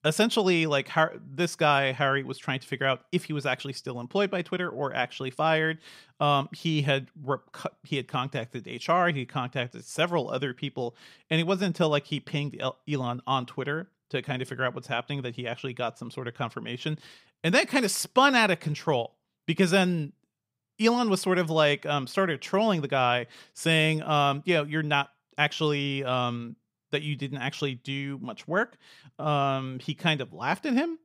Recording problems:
none

